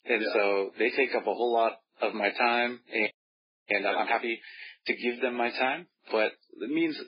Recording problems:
garbled, watery; badly; nothing above 5 kHz
thin; somewhat; fading below 300 Hz
high-pitched whine; very faint; throughout; 5 kHz, 70 dB below the speech
audio freezing; at 3 s for 0.5 s

